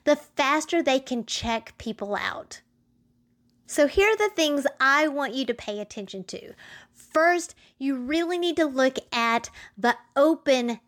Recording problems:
none

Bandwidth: 18.5 kHz